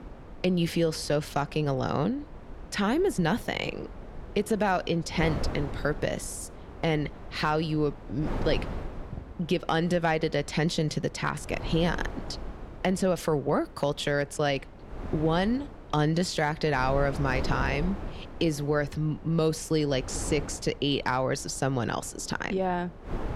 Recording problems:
wind noise on the microphone; occasional gusts; 15 dB below the speech

